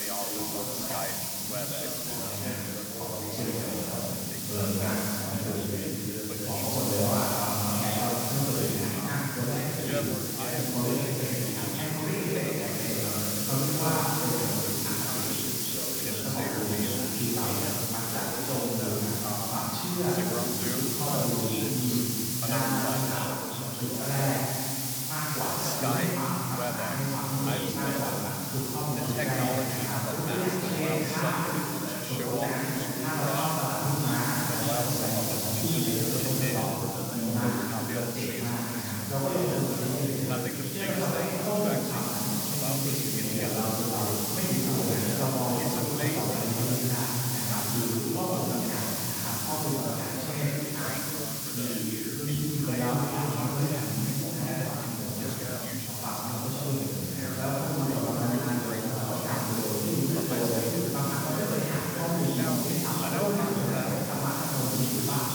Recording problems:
room echo; strong; dies away in 3 s
off-mic speech; far
background chatter; loud; throughout; 2 voices, 7 dB below the speech
hiss; loud; throughout; as loud as the speech

